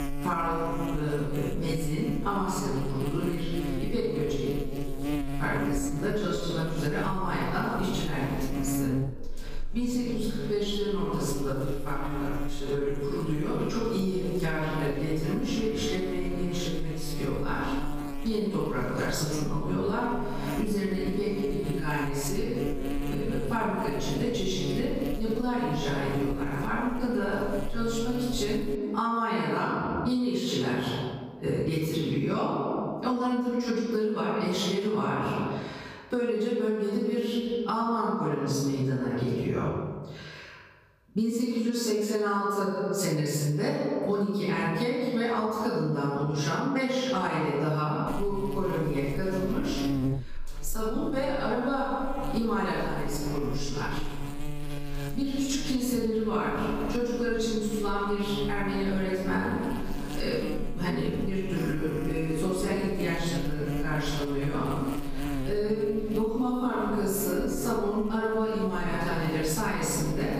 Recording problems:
room echo; strong; dies away in 1.3 s
off-mic speech; far
squashed, flat; somewhat
electrical hum; noticeable; until 29 s and from 48 s on; 60 Hz, 10 dB below the speech

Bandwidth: 15 kHz